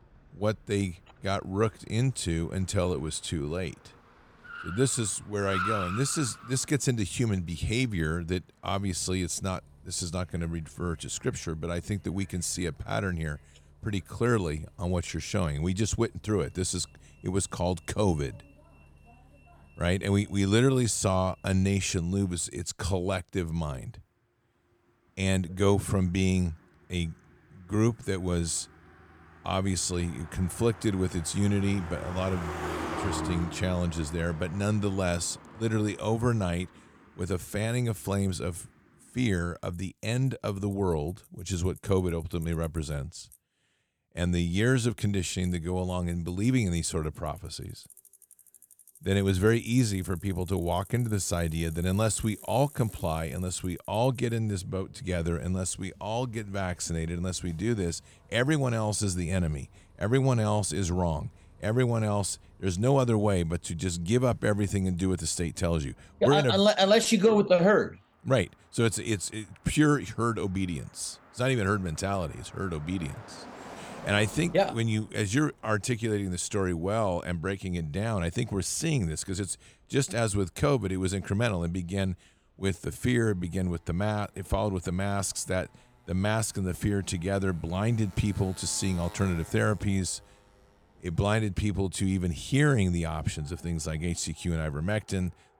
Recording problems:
traffic noise; noticeable; throughout; 15 dB below the speech

